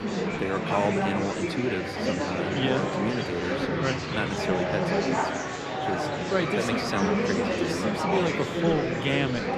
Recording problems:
murmuring crowd; very loud; throughout; 2 dB above the speech

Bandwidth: 14.5 kHz